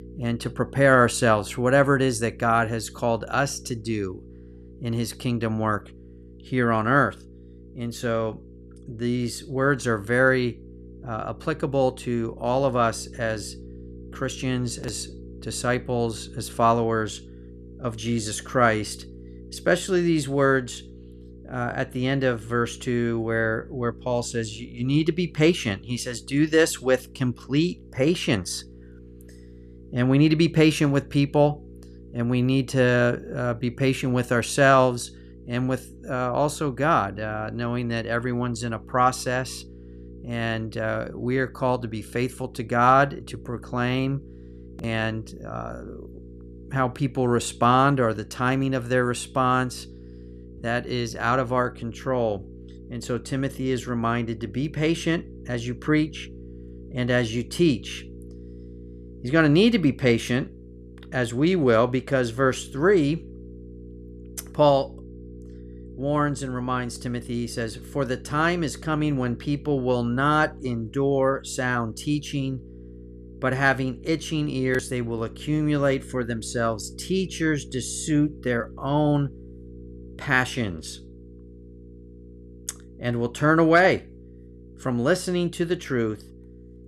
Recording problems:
electrical hum; faint; throughout; 60 Hz, 25 dB below the speech

